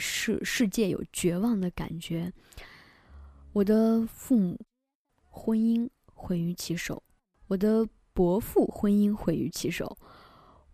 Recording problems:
abrupt cut into speech; at the start

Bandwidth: 14.5 kHz